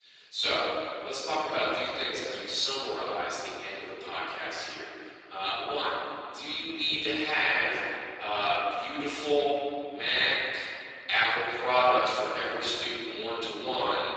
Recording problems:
room echo; strong; dies away in 1.8 s
off-mic speech; far
garbled, watery; badly; nothing above 7.5 kHz
echo of what is said; noticeable; throughout; 310 ms later, 15 dB below the speech
thin; somewhat; fading below 350 Hz

